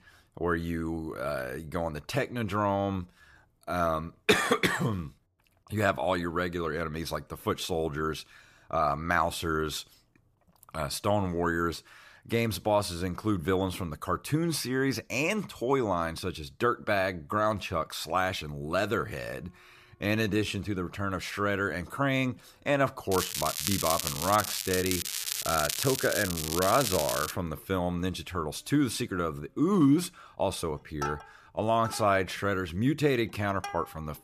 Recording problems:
crackling; loud; from 23 to 27 s; 2 dB below the speech
background music; noticeable; throughout; 15 dB below the speech
uneven, jittery; strongly; from 2.5 to 32 s

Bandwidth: 14.5 kHz